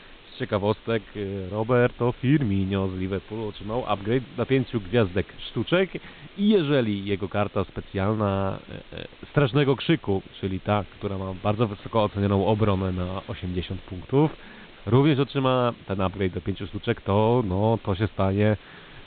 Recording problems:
high frequencies cut off; severe; nothing above 4 kHz
hiss; faint; throughout; 25 dB below the speech

